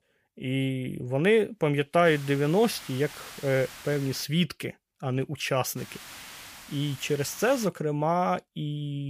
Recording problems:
hiss; noticeable; from 2 to 4 s and from 6 to 7.5 s; 15 dB below the speech
abrupt cut into speech; at the end

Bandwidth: 15 kHz